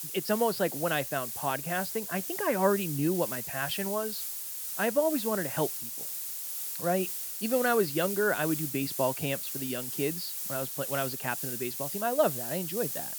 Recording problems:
high frequencies cut off; noticeable; nothing above 5.5 kHz
hiss; loud; throughout; 3 dB below the speech

